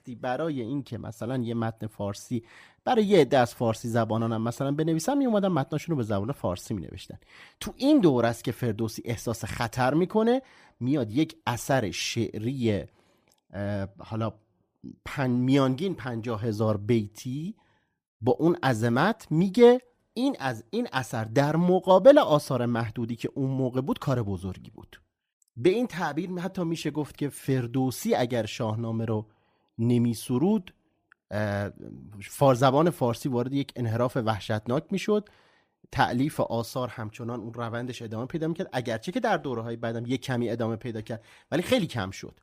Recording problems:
none

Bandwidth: 15 kHz